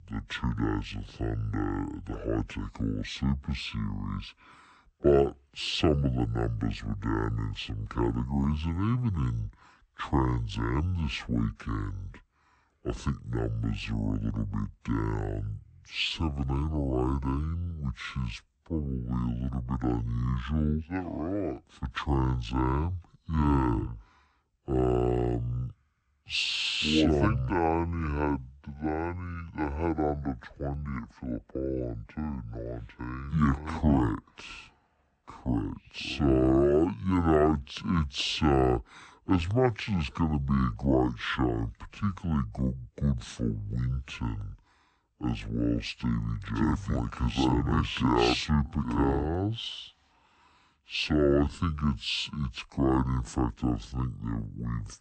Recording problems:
wrong speed and pitch; too slow and too low; 0.5 times normal speed

